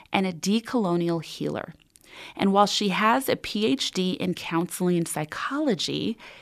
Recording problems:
none

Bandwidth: 14 kHz